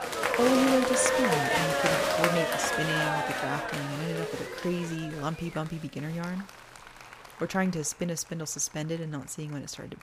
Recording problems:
crowd noise; very loud; throughout; 4 dB above the speech

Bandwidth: 15 kHz